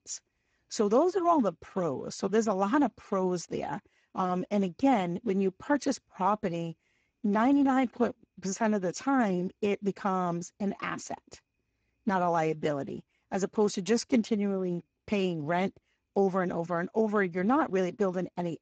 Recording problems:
garbled, watery; badly; nothing above 7.5 kHz

